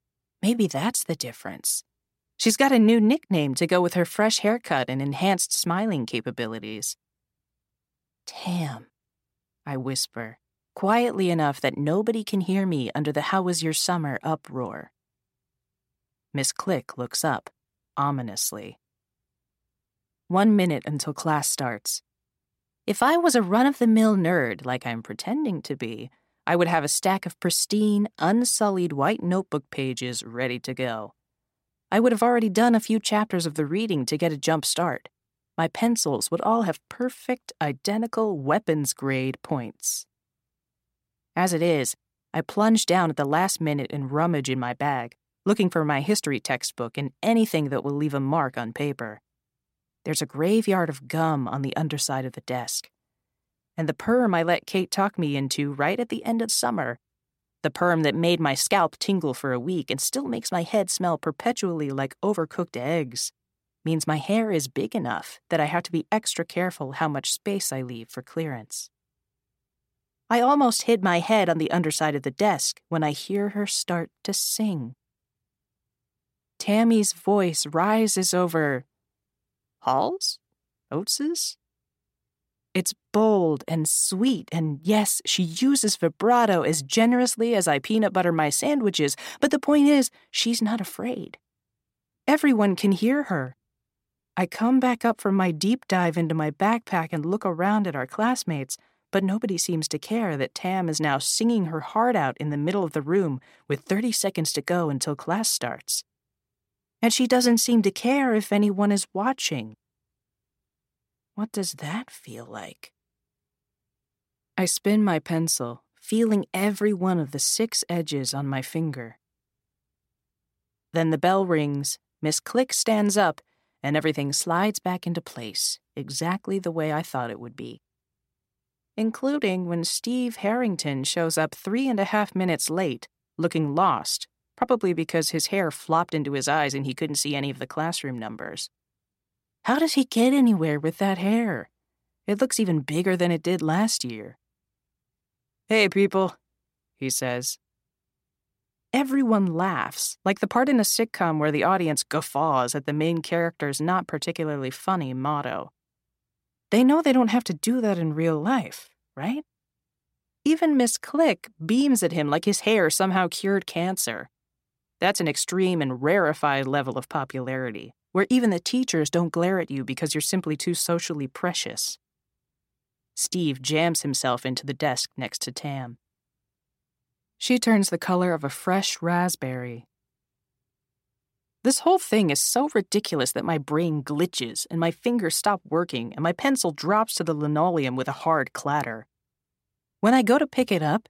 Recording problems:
none

